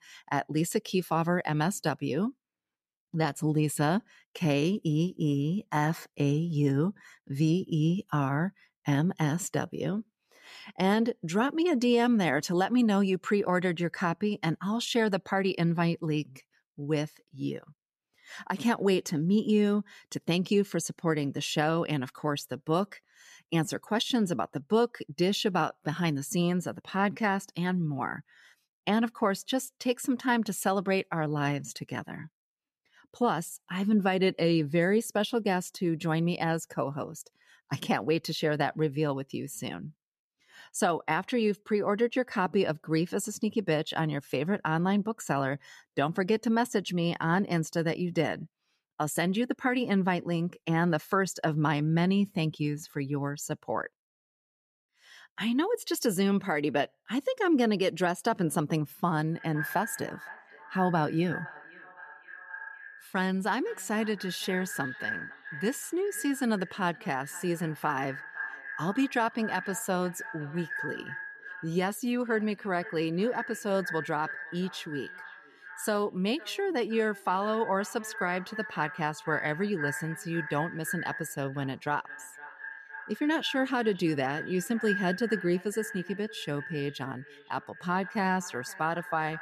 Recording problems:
echo of what is said; strong; from 59 s on; 510 ms later, 10 dB below the speech

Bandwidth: 14.5 kHz